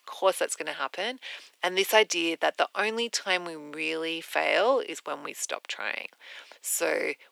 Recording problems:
thin; very; fading below 350 Hz

